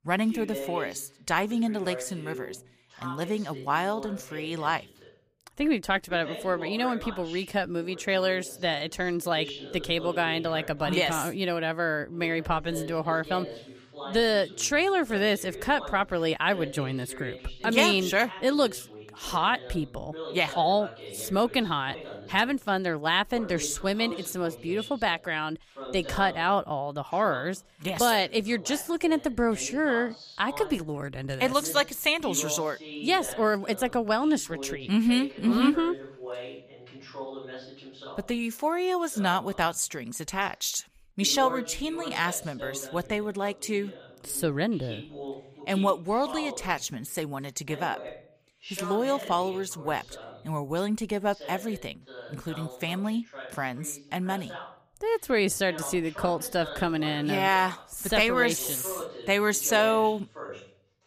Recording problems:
voice in the background; noticeable; throughout; 15 dB below the speech

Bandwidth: 15 kHz